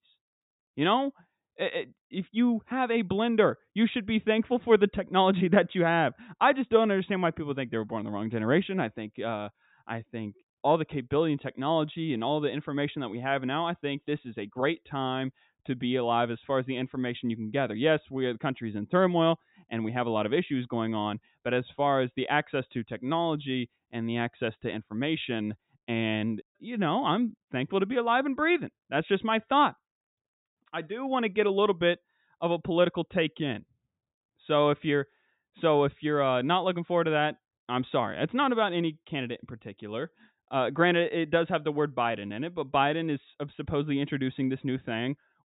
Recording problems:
high frequencies cut off; severe; nothing above 4 kHz

